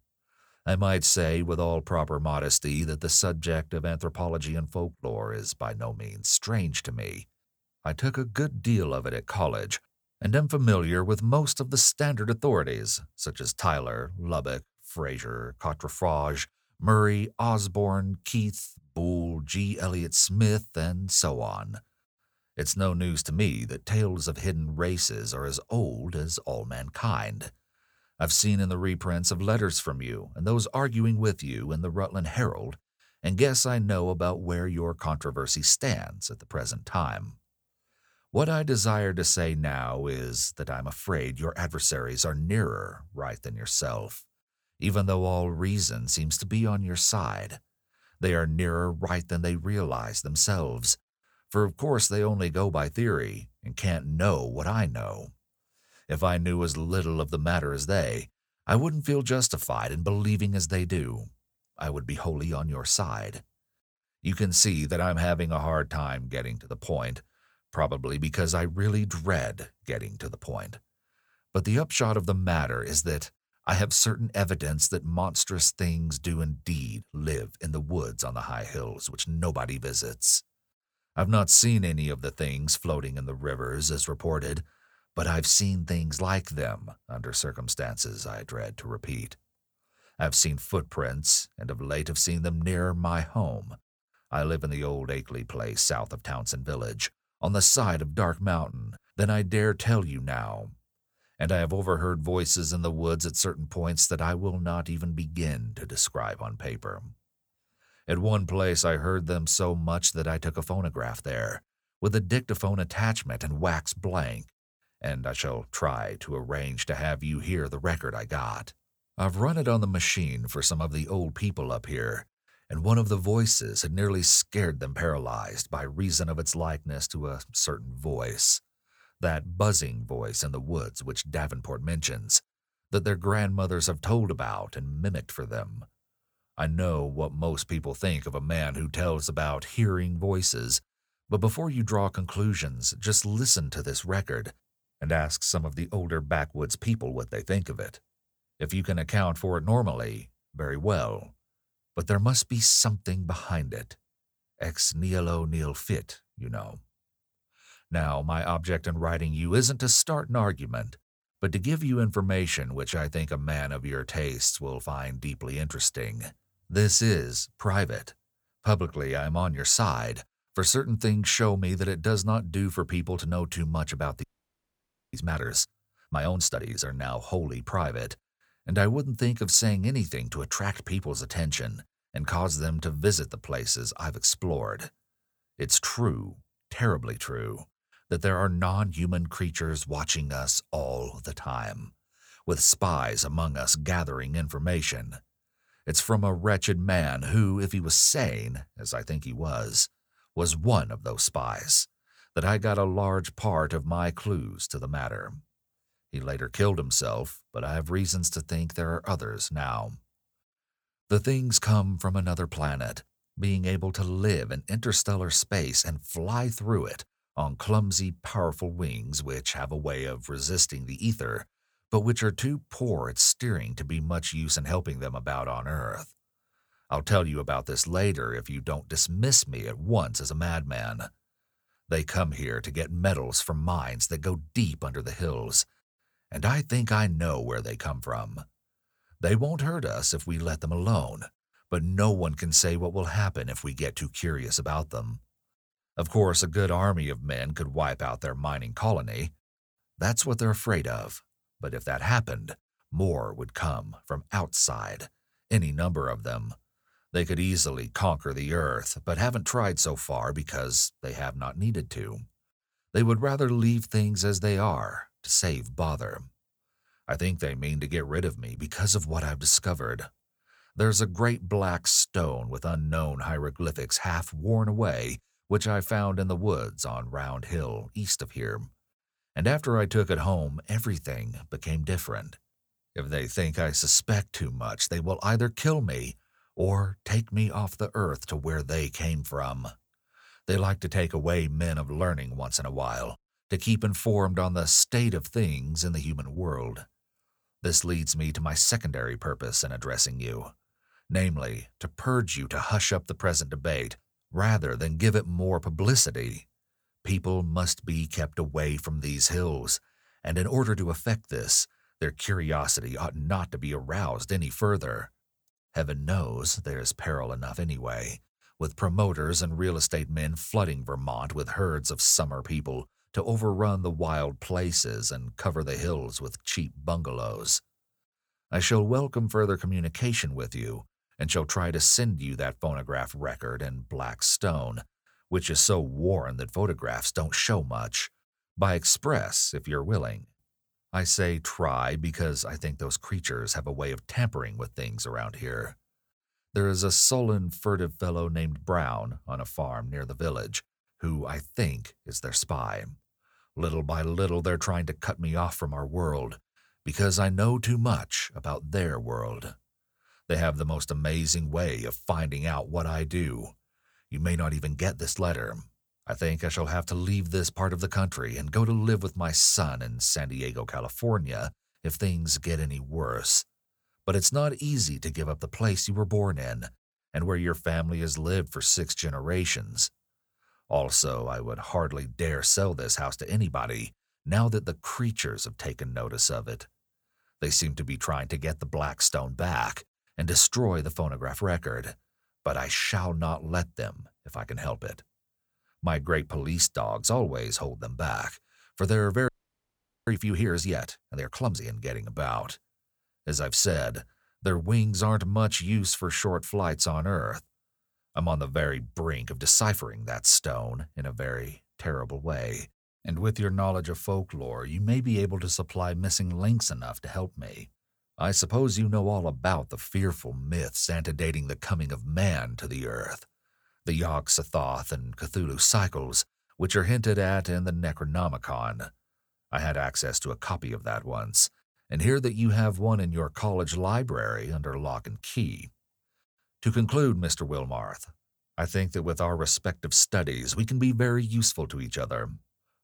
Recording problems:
audio freezing; at 2:54 for 1 s and at 6:39 for 1 s

